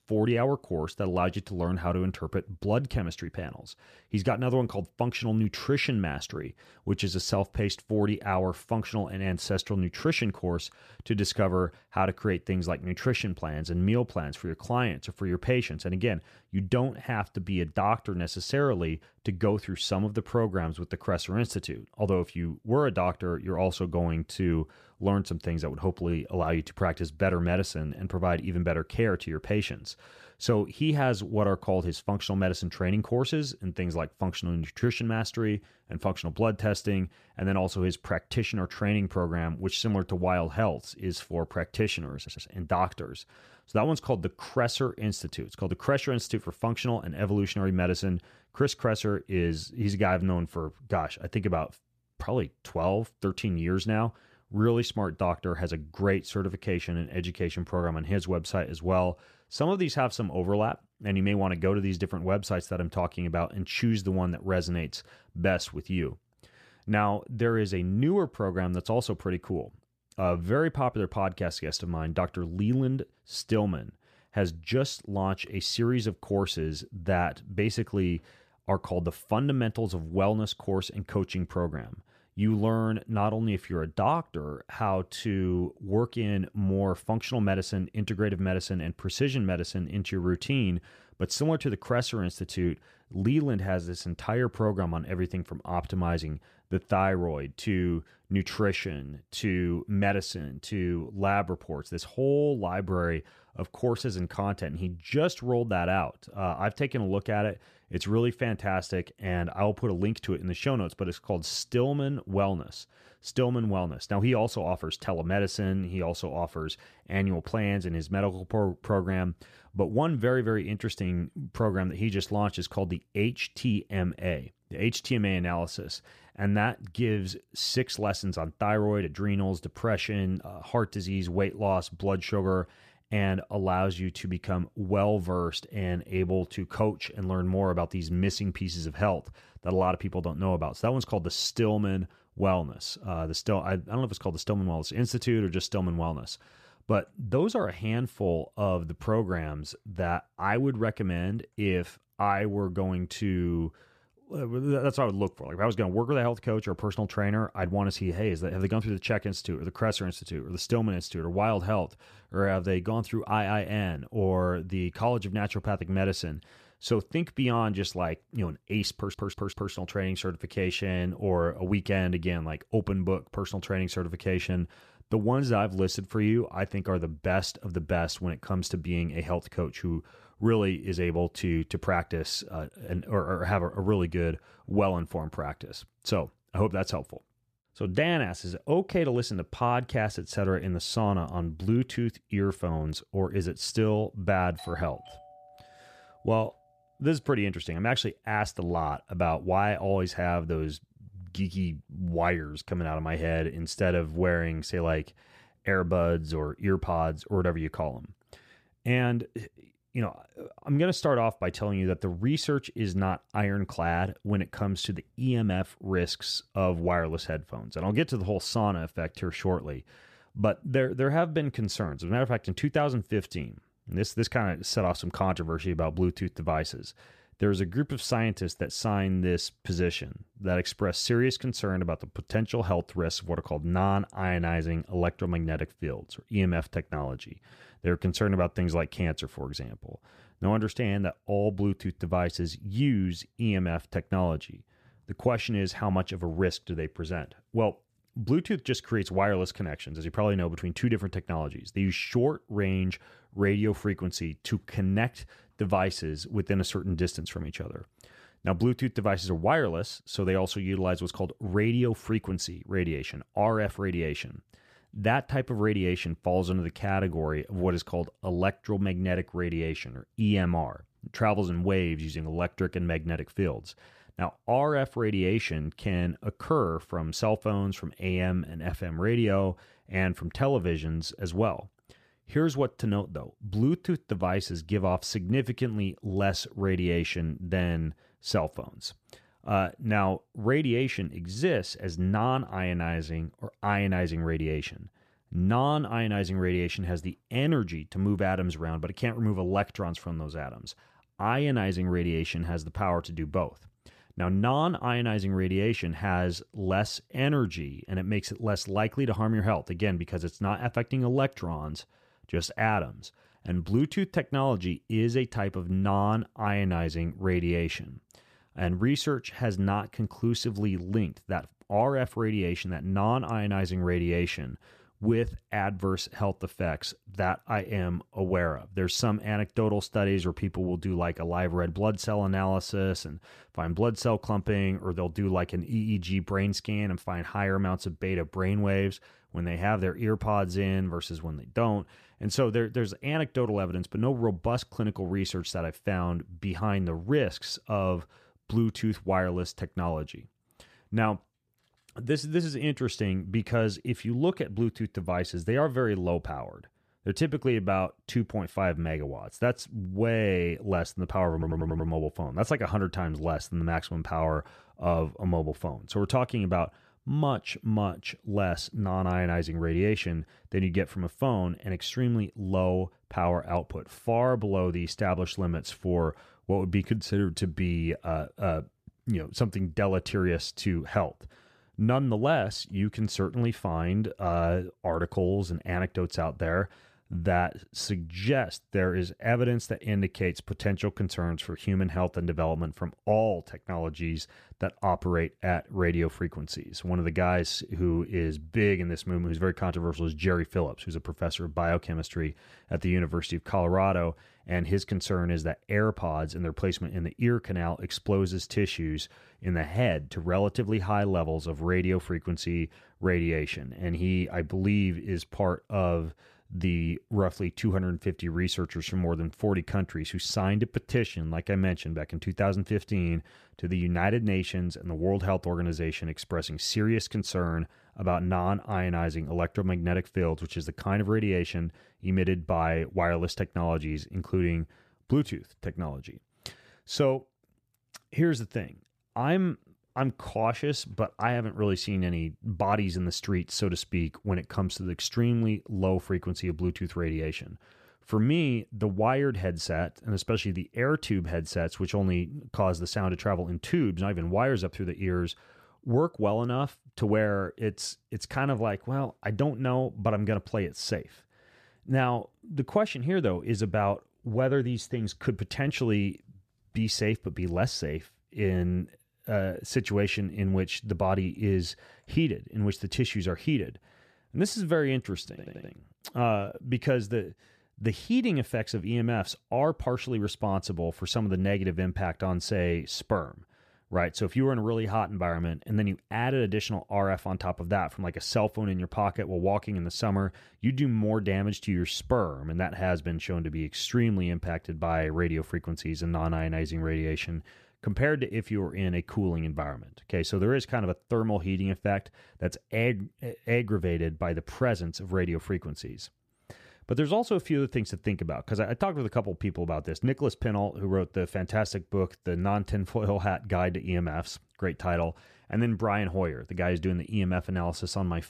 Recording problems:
audio stuttering; 4 times, first at 42 s
doorbell; faint; from 3:15 to 3:16; peak 15 dB below the speech

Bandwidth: 14.5 kHz